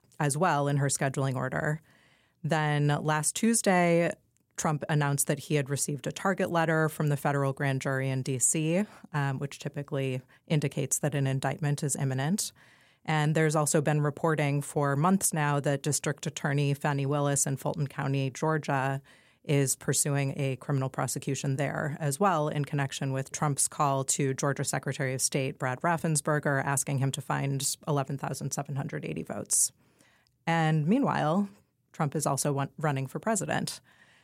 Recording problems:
none

